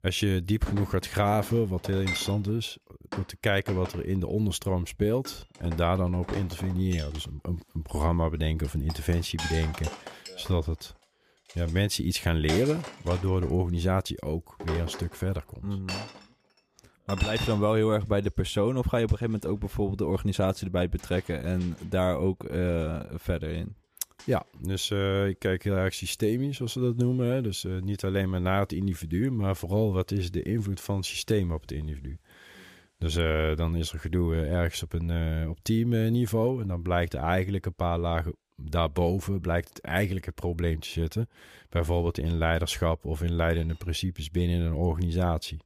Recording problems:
household noises; noticeable; throughout; 10 dB below the speech

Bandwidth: 15 kHz